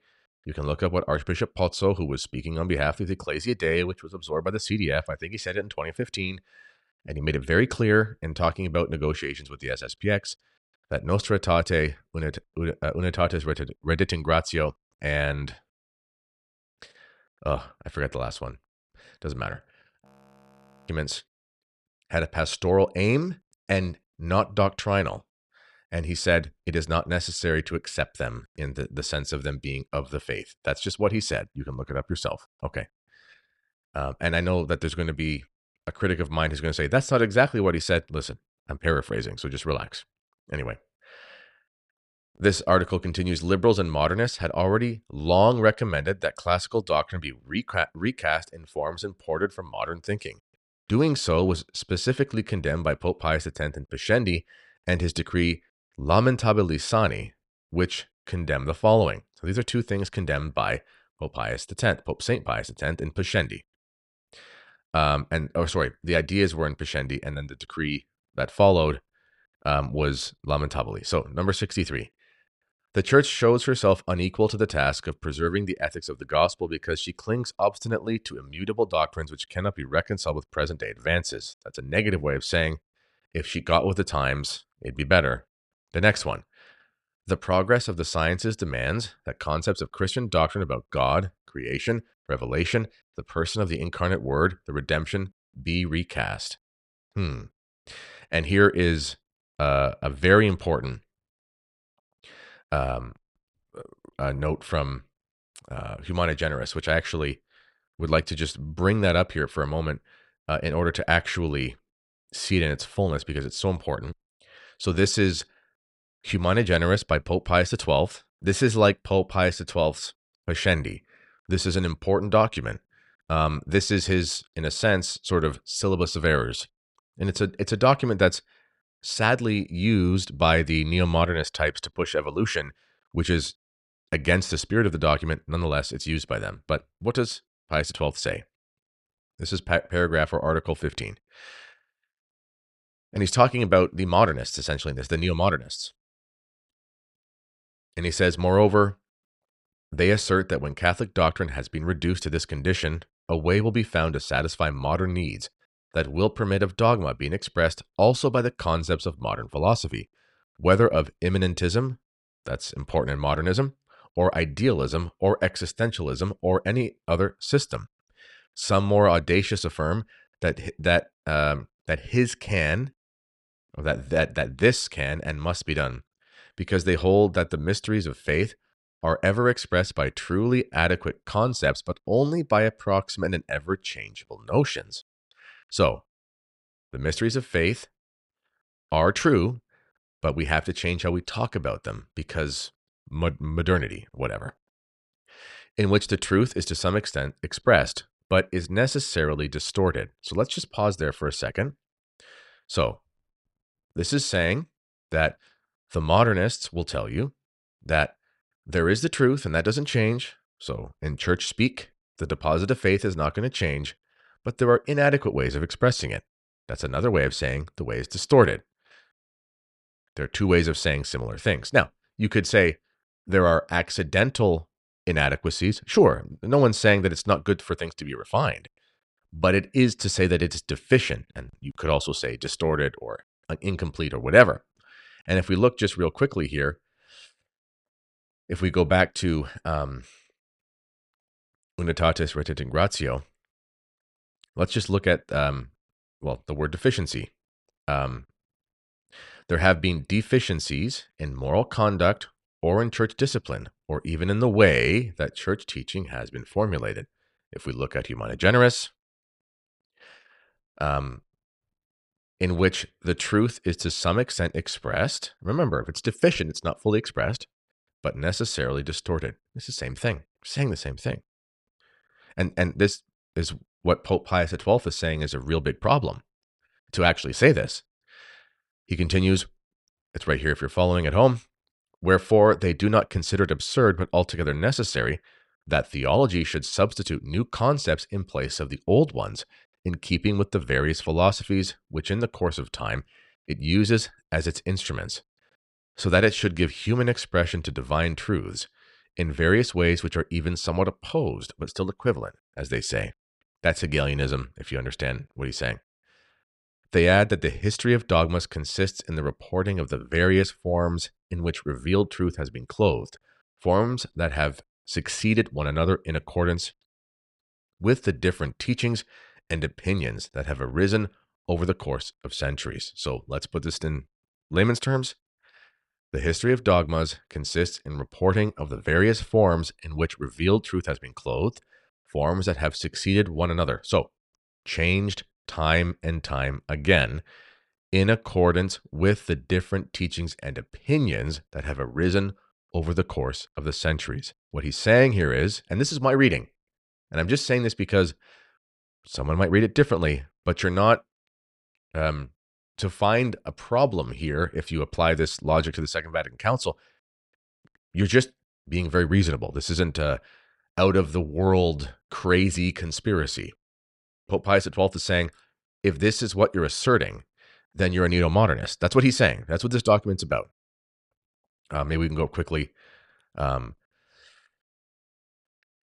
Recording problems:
audio freezing; at 20 s for 1 s

